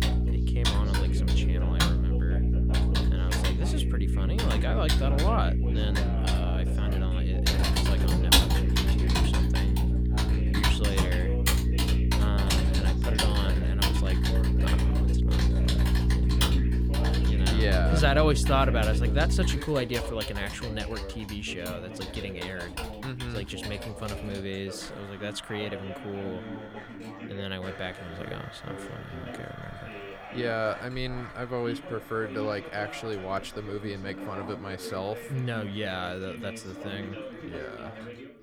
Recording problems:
household noises; very loud; throughout; 1 dB above the speech
electrical hum; loud; until 20 s; 60 Hz, 5 dB below the speech
background chatter; loud; throughout; 2 voices, 8 dB below the speech

